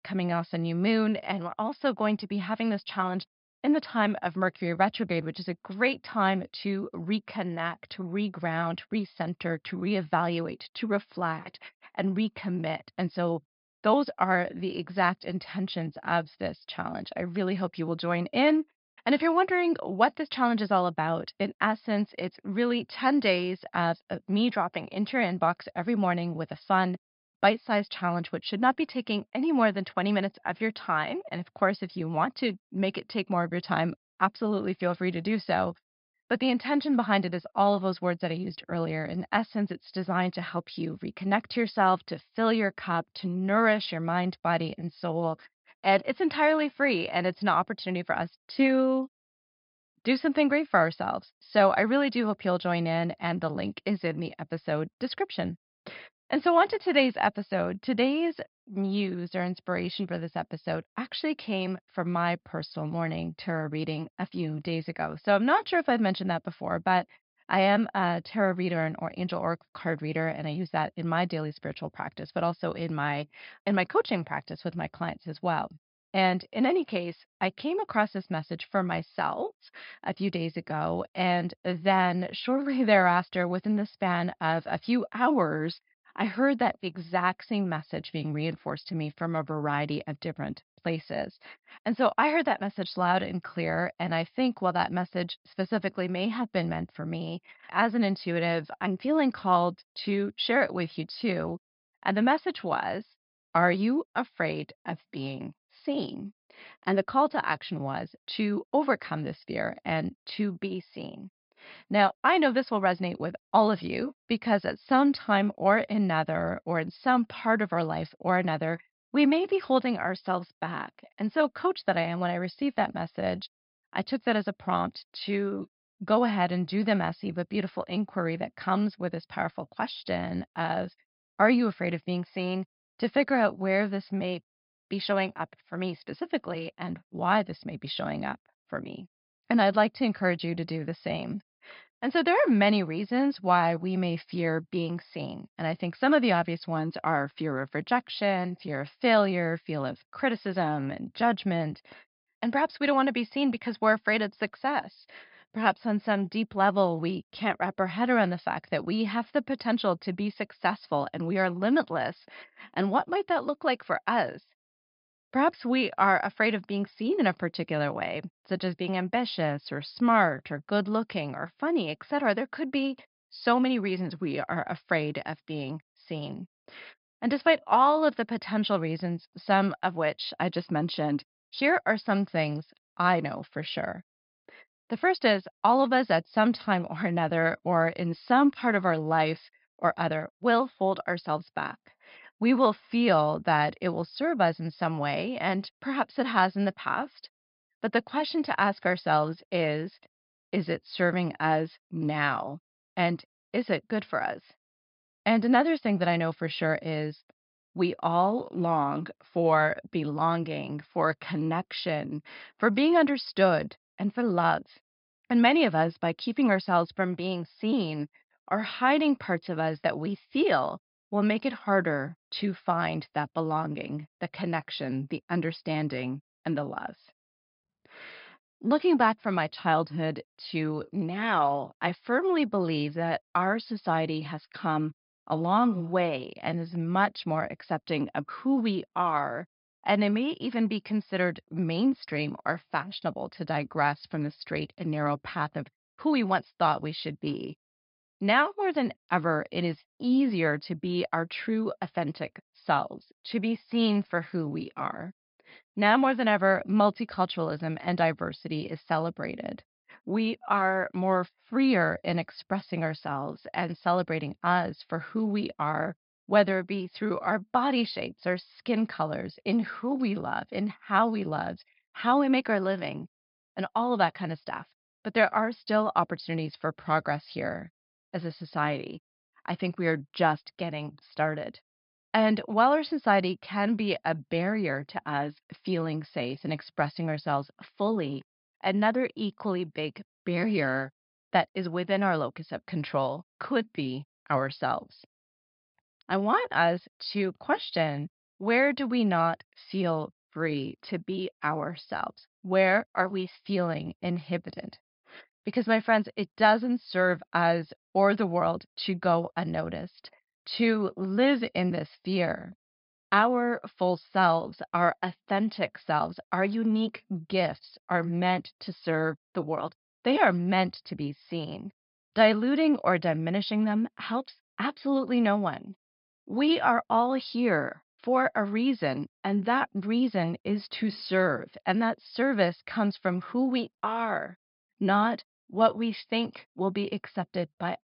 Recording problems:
high frequencies cut off; noticeable; nothing above 5 kHz

